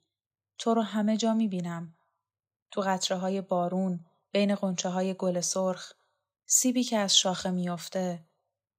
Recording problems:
none

